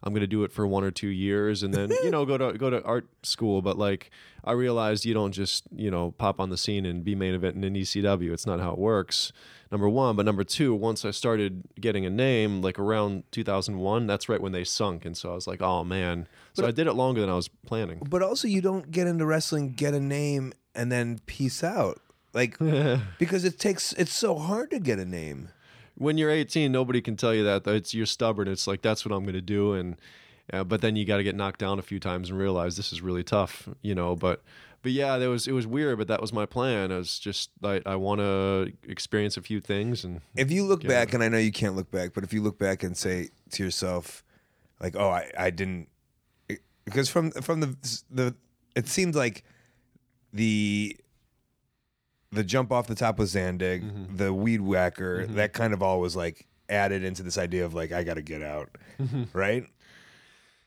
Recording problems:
none

